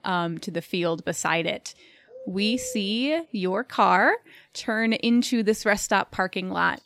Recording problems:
animal sounds; noticeable; throughout; 20 dB below the speech

